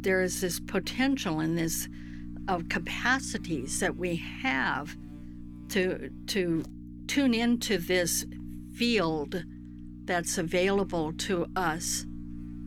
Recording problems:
electrical hum; noticeable; throughout; 60 Hz, 20 dB below the speech

